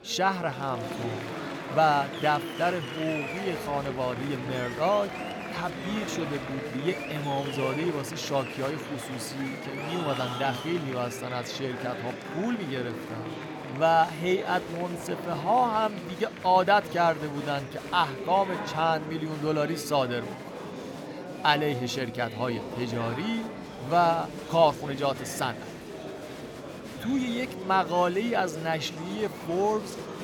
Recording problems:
murmuring crowd; loud; throughout; 8 dB below the speech

